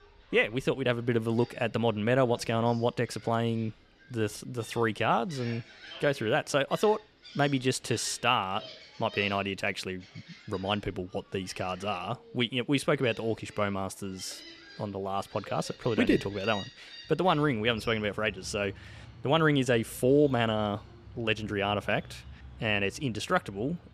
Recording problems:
animal sounds; noticeable; throughout; 20 dB below the speech

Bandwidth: 14.5 kHz